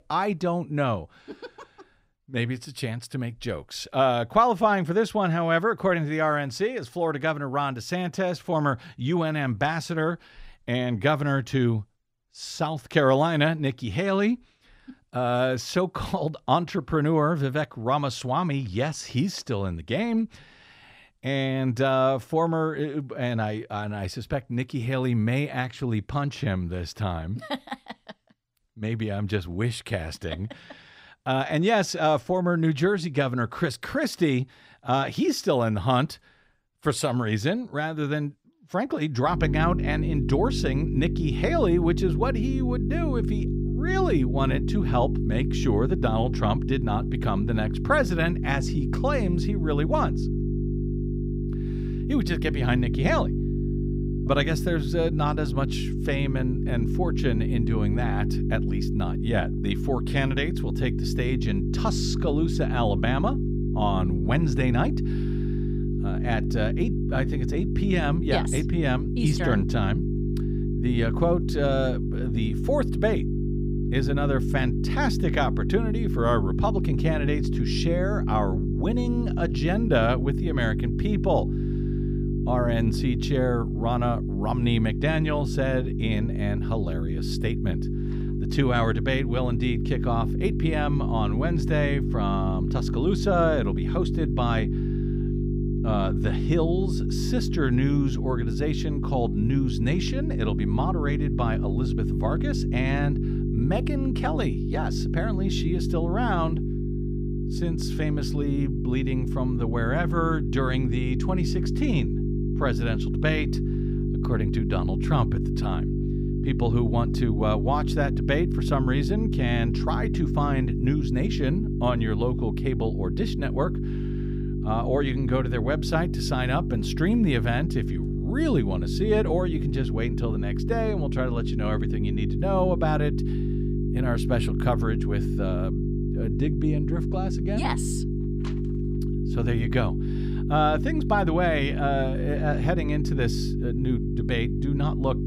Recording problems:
electrical hum; loud; from 39 s on; 50 Hz, 7 dB below the speech

